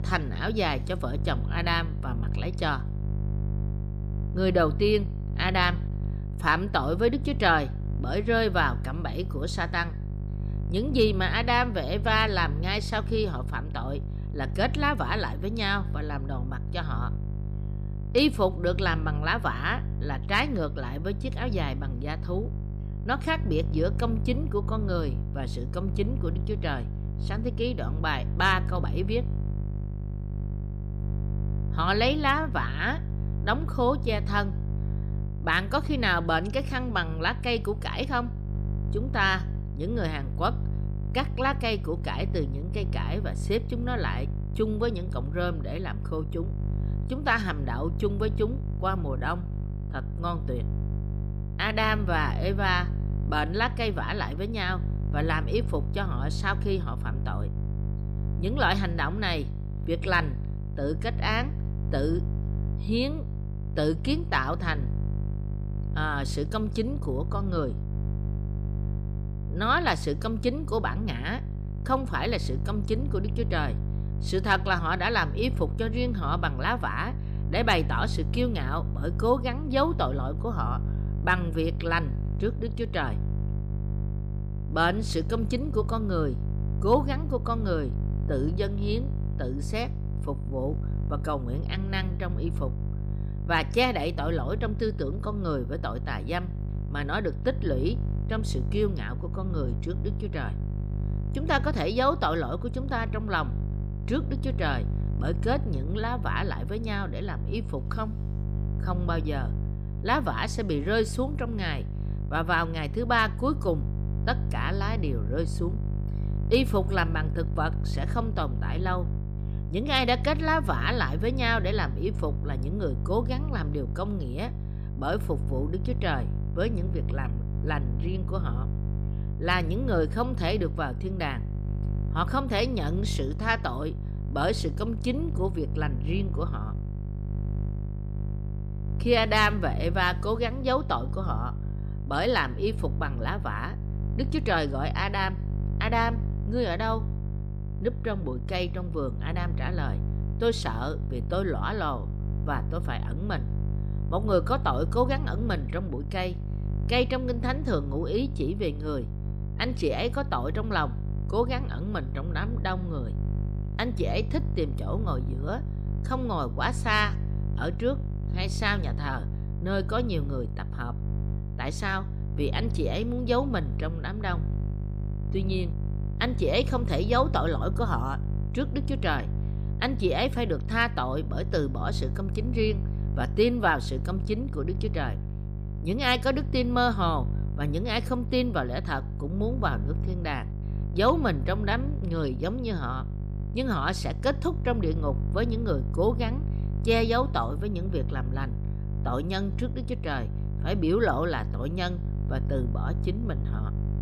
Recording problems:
electrical hum; noticeable; throughout; 50 Hz, 15 dB below the speech

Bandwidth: 15 kHz